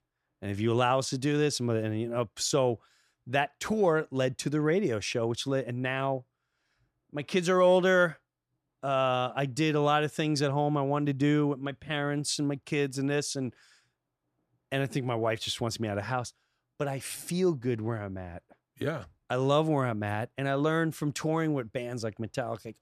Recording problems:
none

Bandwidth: 14 kHz